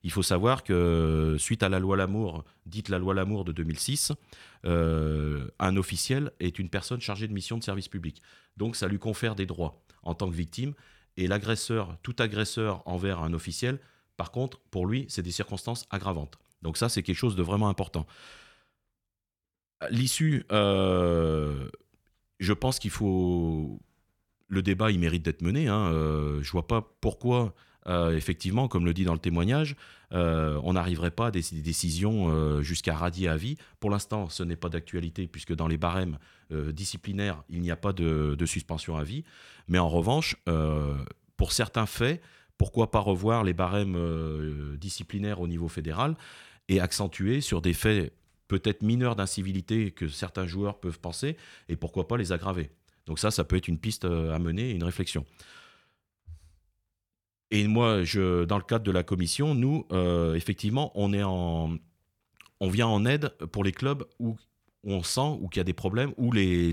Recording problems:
abrupt cut into speech; at the end

